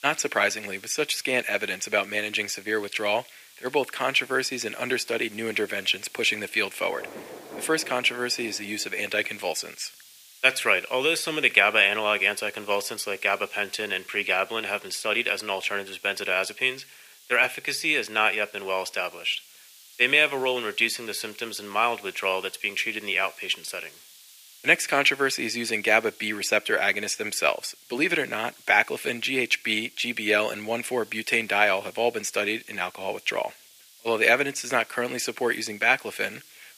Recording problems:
thin; very; fading below 500 Hz
rain or running water; faint; until 9 s; 25 dB below the speech
hiss; faint; throughout; 25 dB below the speech

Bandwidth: 15 kHz